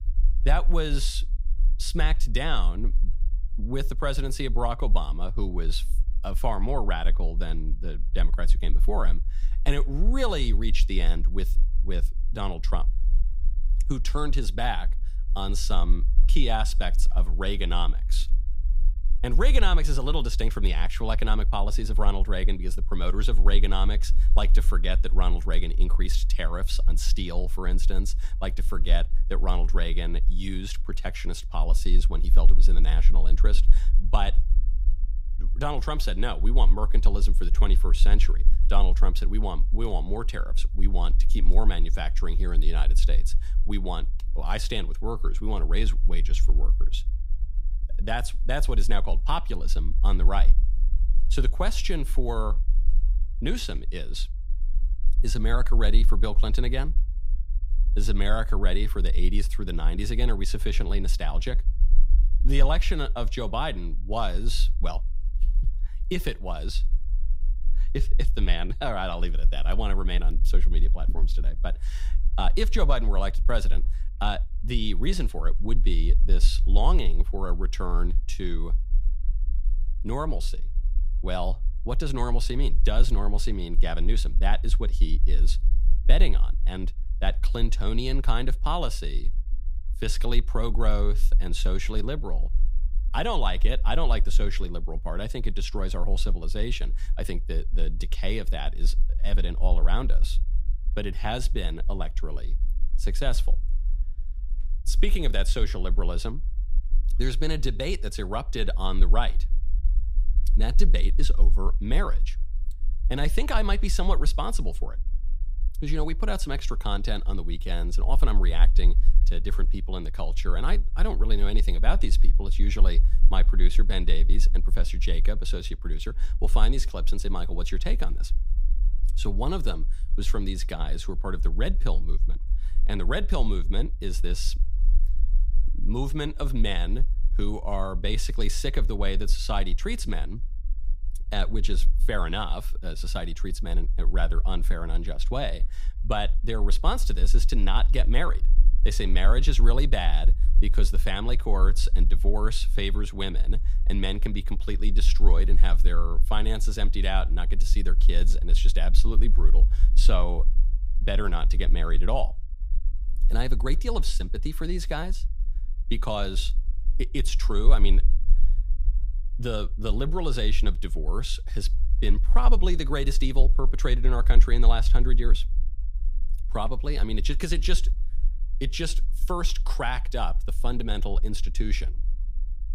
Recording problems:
low rumble; faint; throughout; 20 dB below the speech

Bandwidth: 15.5 kHz